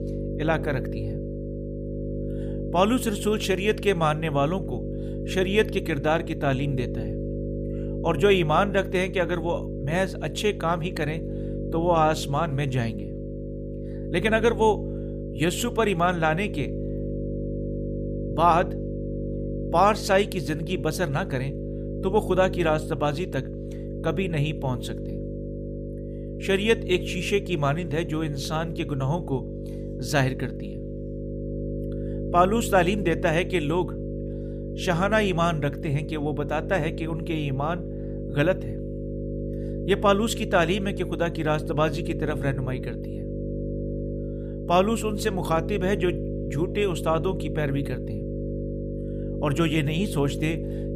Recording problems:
electrical hum; noticeable; throughout; 50 Hz, 10 dB below the speech

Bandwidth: 15 kHz